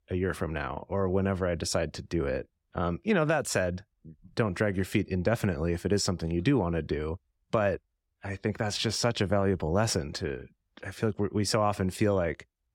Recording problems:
none

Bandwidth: 16.5 kHz